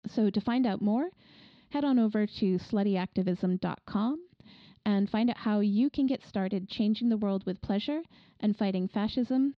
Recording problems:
muffled; very slightly; fading above 4.5 kHz

